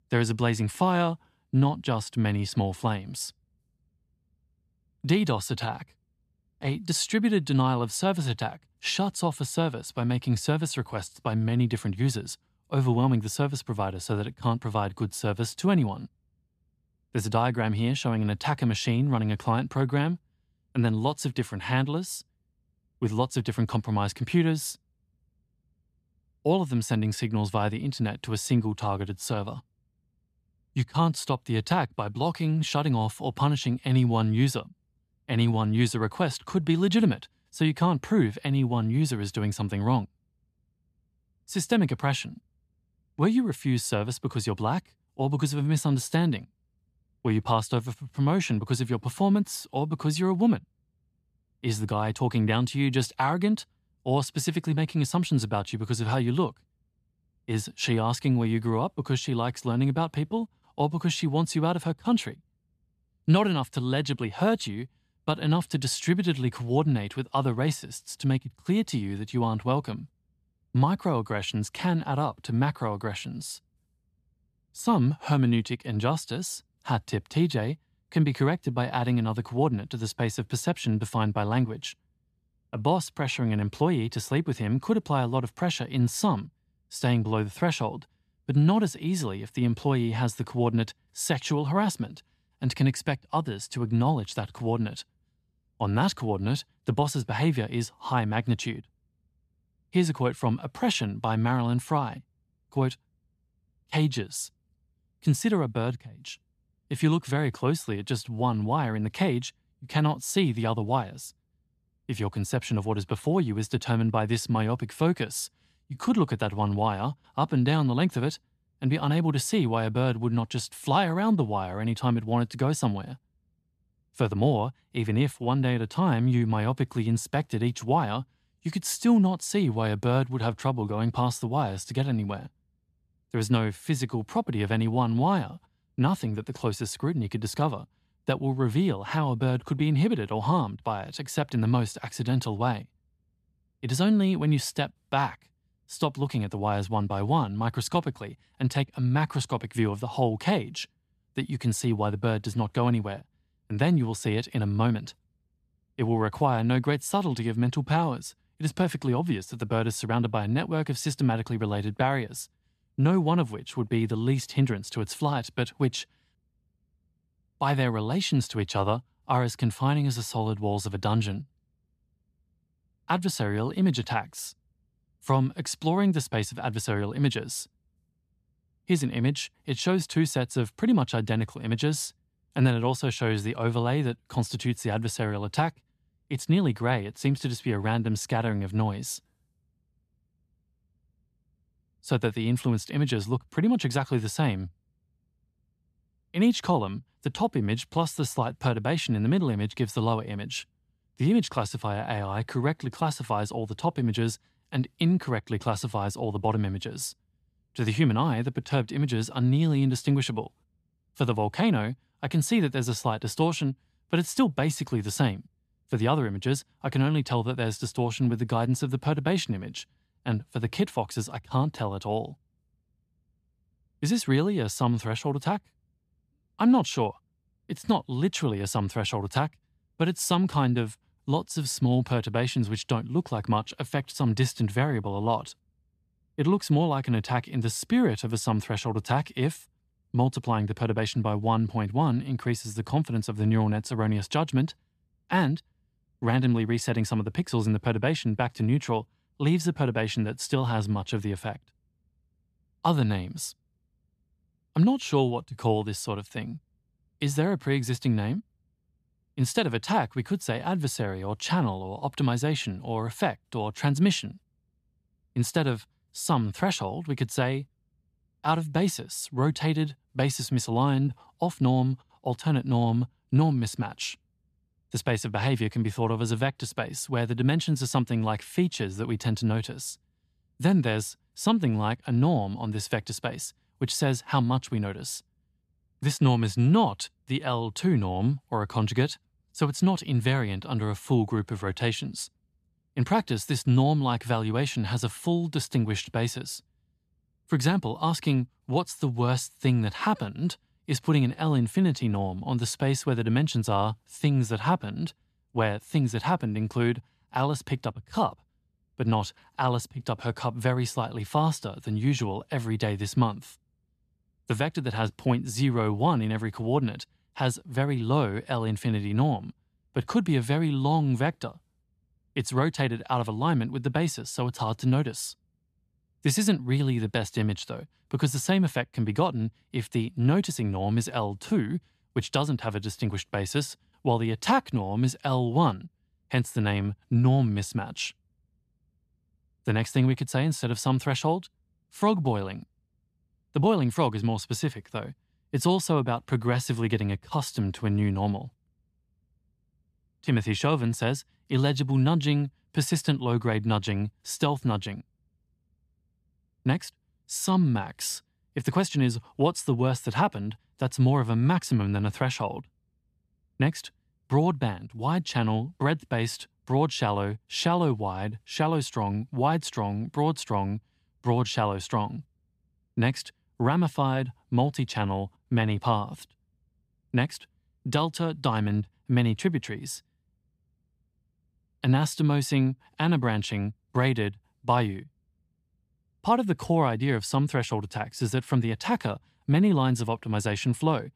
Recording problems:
none

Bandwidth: 14 kHz